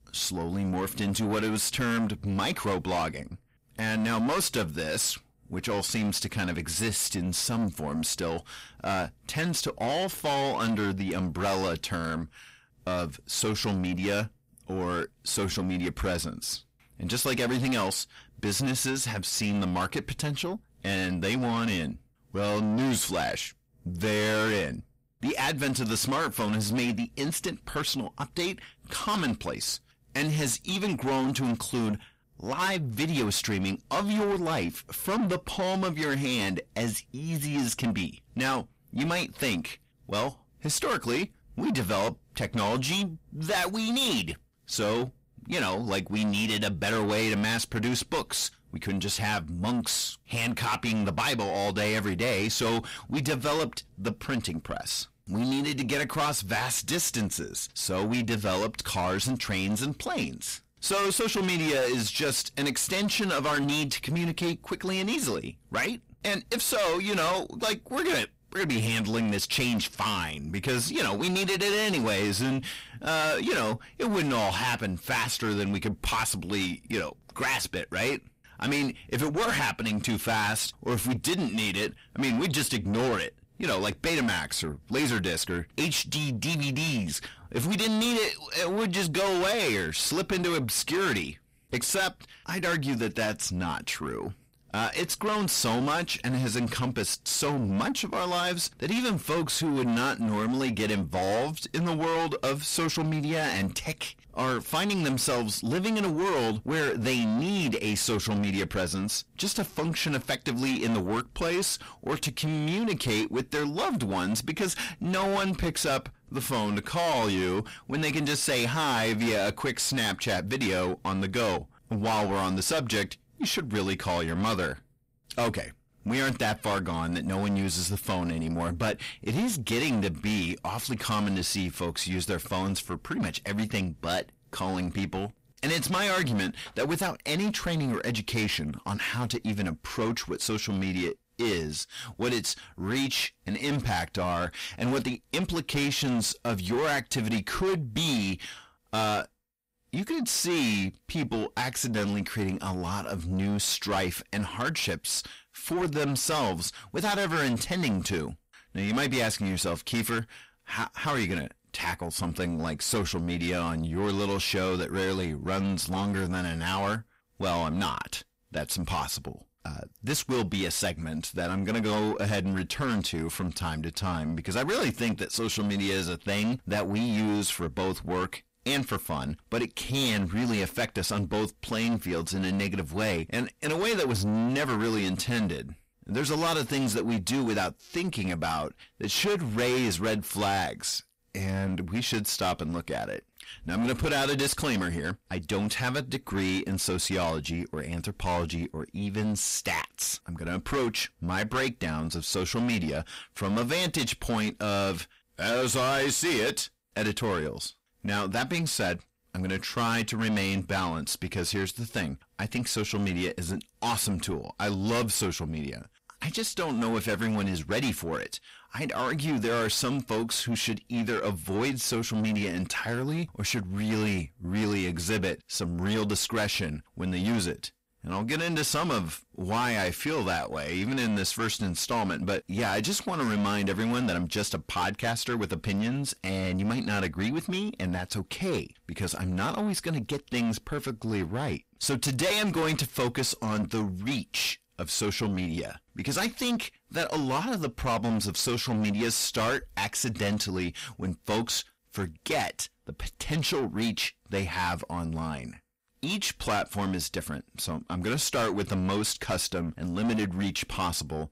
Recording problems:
distortion; heavy; 6 dB below the speech

